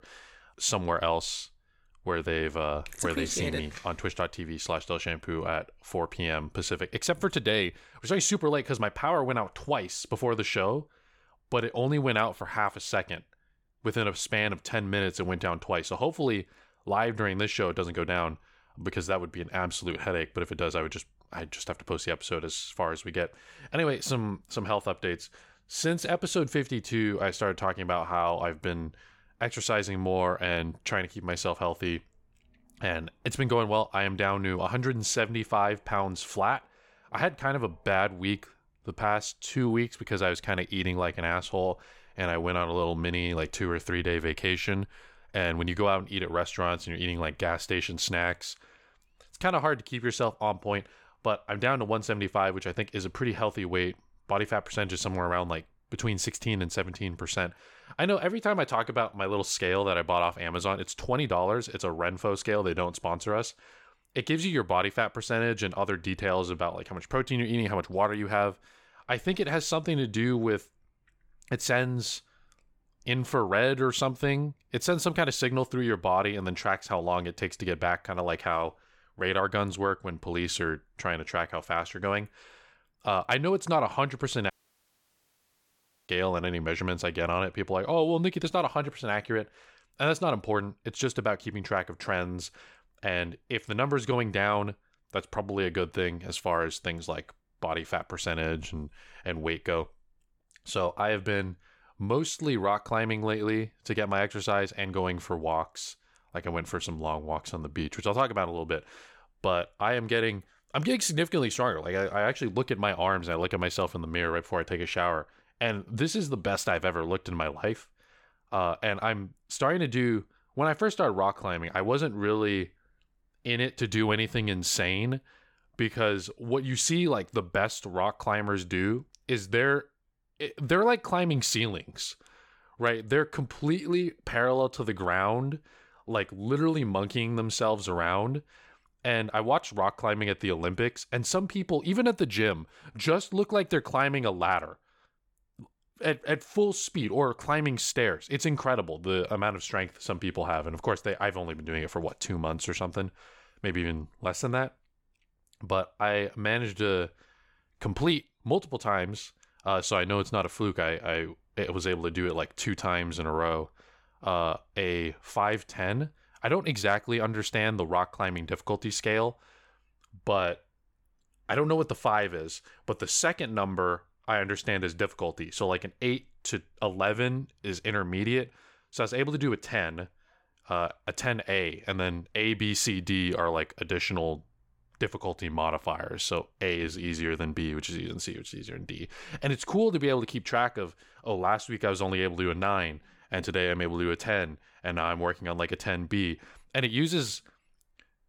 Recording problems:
audio cutting out; at 1:25 for 1.5 s

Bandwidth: 17 kHz